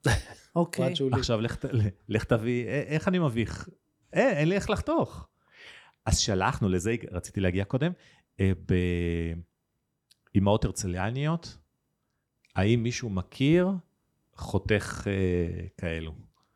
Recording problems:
none

